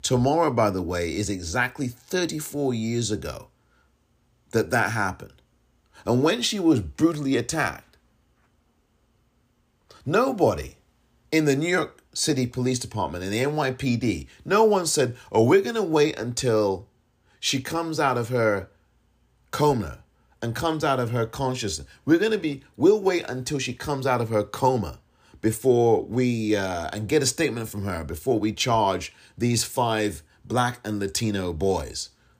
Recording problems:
none

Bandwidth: 15 kHz